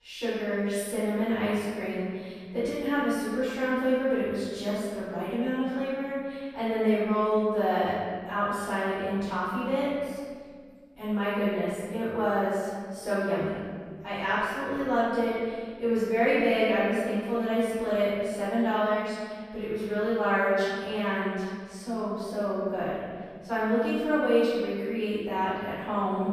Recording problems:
room echo; strong; dies away in 1.8 s
off-mic speech; far

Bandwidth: 14.5 kHz